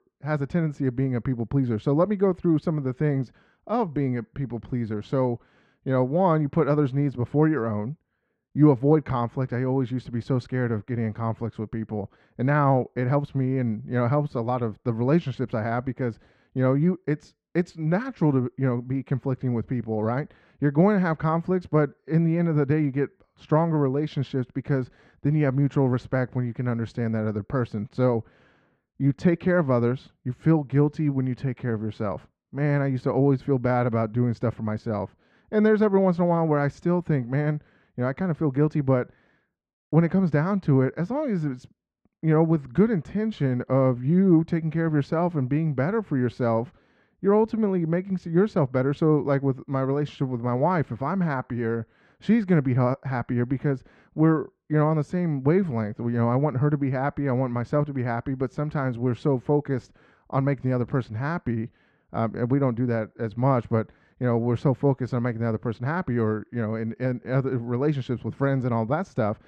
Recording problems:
muffled; very; fading above 2 kHz

